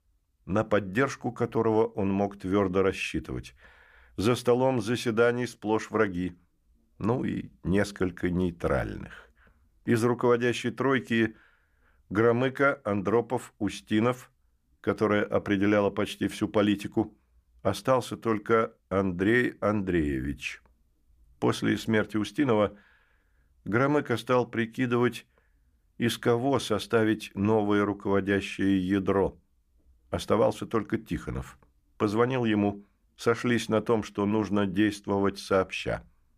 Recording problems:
none

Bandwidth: 15 kHz